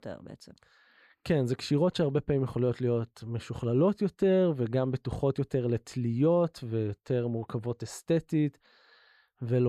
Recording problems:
abrupt cut into speech; at the end

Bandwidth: 14 kHz